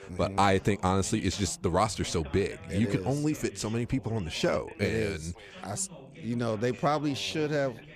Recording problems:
background chatter; noticeable; throughout; 2 voices, 20 dB below the speech

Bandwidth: 15 kHz